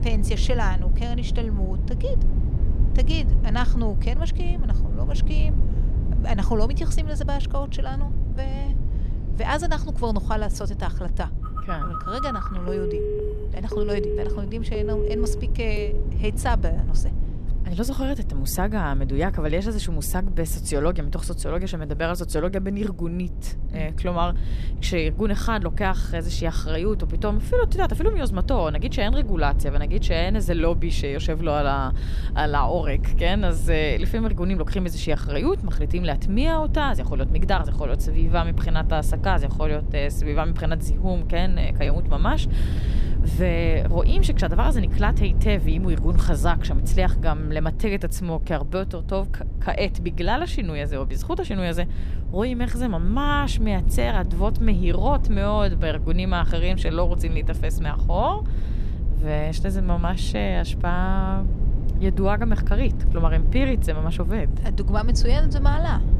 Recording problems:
low rumble; noticeable; throughout; 15 dB below the speech
phone ringing; loud; from 11 to 16 s; peak 1 dB above the speech

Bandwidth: 14 kHz